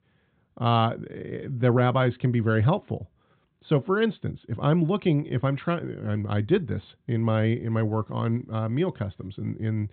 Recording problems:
high frequencies cut off; severe; nothing above 4 kHz

